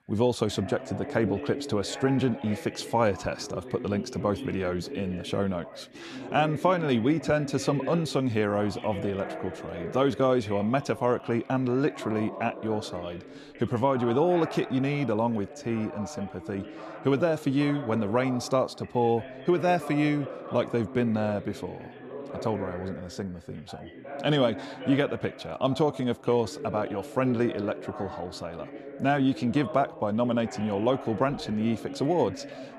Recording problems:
background chatter; noticeable; throughout; 2 voices, 10 dB below the speech

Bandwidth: 13.5 kHz